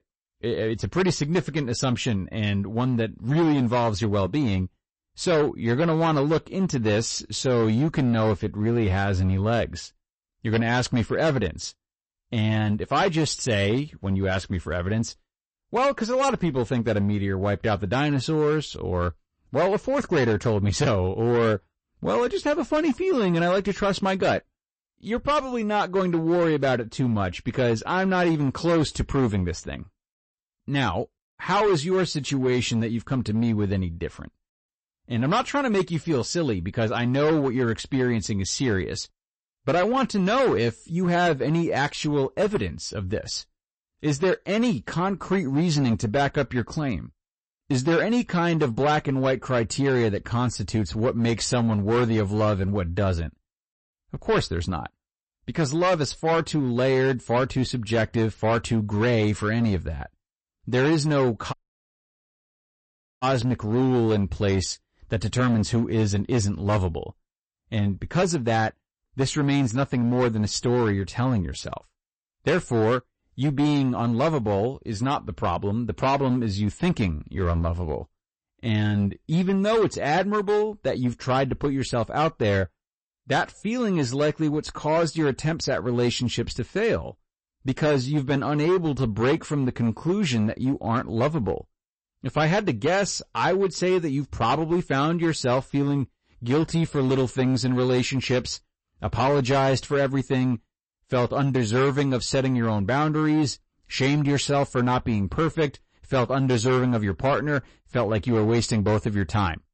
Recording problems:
distortion; slight; 10% of the sound clipped
garbled, watery; slightly; nothing above 8 kHz
audio cutting out; at 1:02 for 1.5 s

